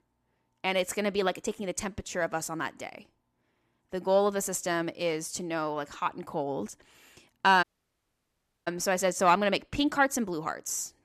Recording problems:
audio cutting out; at 7.5 s for 1 s

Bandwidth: 14 kHz